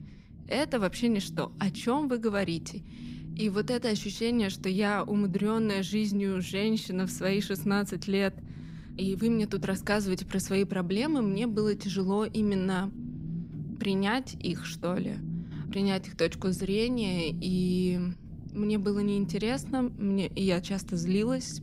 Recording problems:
low rumble; noticeable; throughout; 15 dB below the speech

